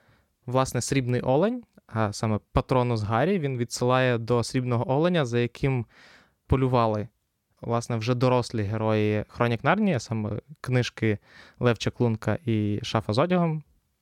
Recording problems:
none

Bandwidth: 17.5 kHz